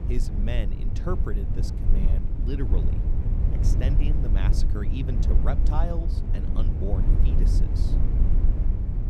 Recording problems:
low rumble; loud; throughout; 2 dB below the speech

